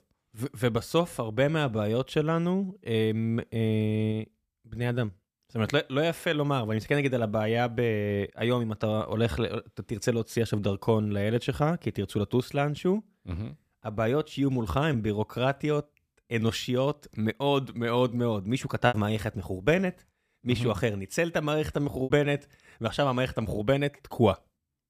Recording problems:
choppy; occasionally; at 19 s and at 22 s; 3% of the speech affected

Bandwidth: 15 kHz